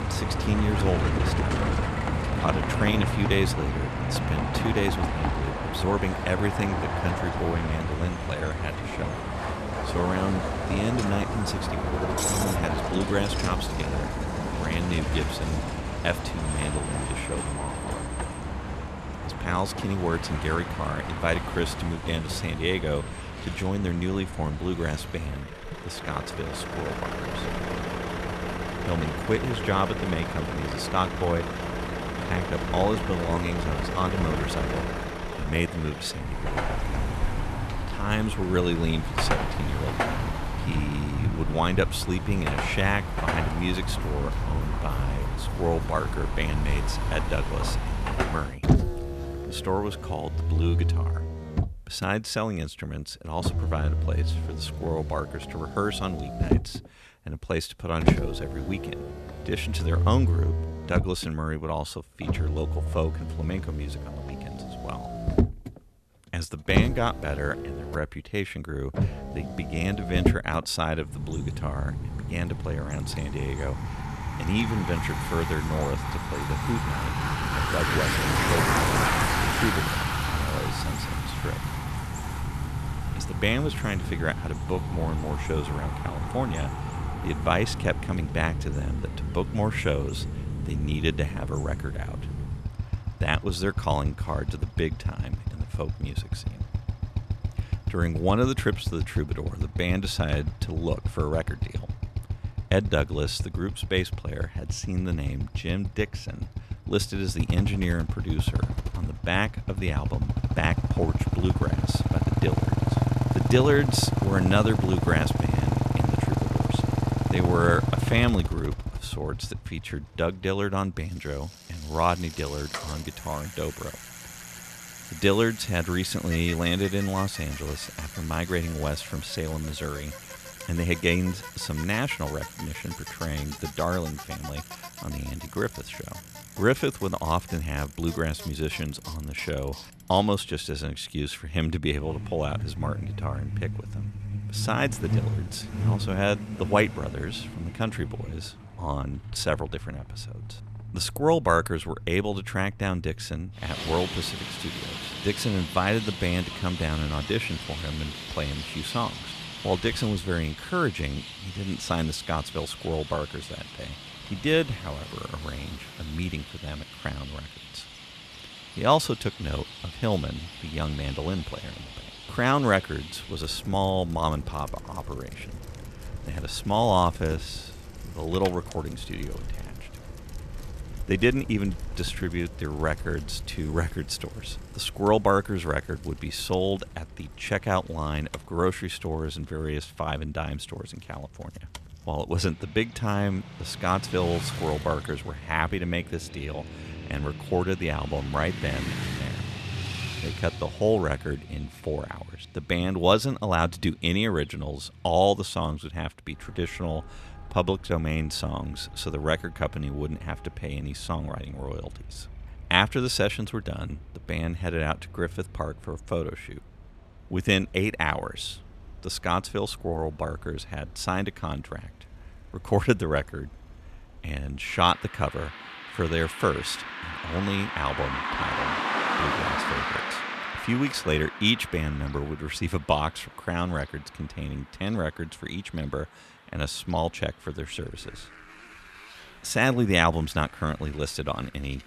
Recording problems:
traffic noise; loud; throughout; 2 dB below the speech

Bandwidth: 13.5 kHz